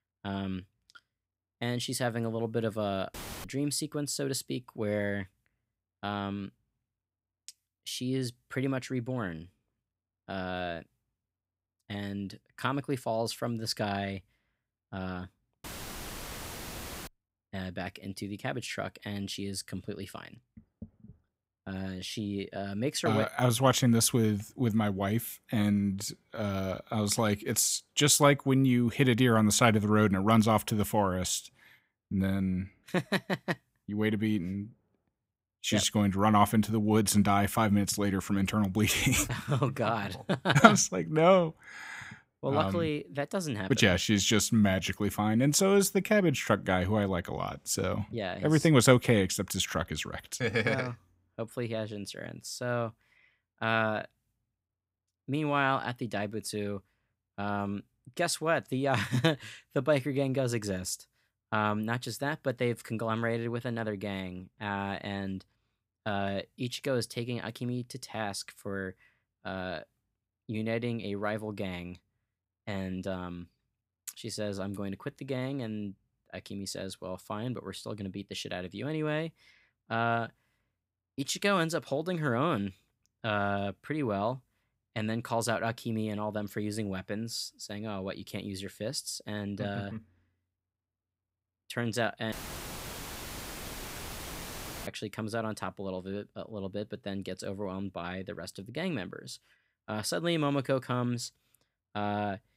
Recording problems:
audio cutting out; filled with static; at 3 s, at 16 s for 1.5 s and at 1:32 for 2.5 s

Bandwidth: 15.5 kHz